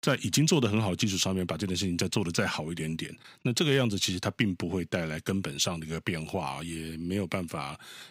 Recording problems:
none

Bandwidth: 15.5 kHz